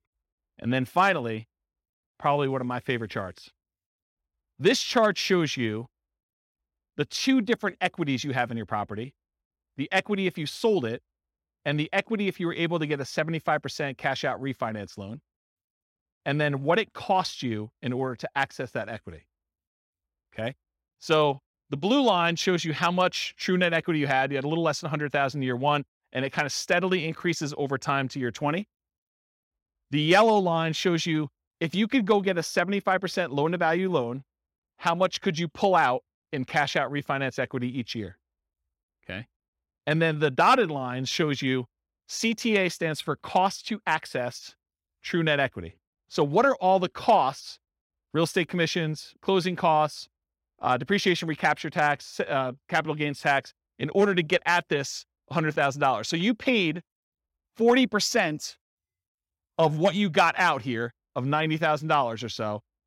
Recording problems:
none

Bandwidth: 16 kHz